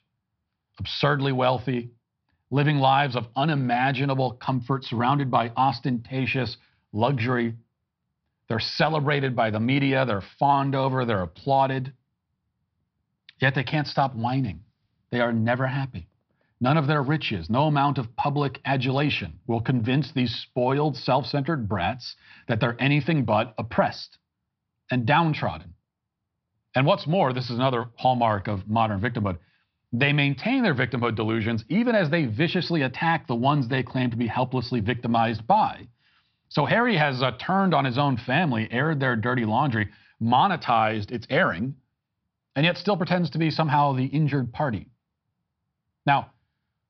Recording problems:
high frequencies cut off; noticeable; nothing above 5.5 kHz

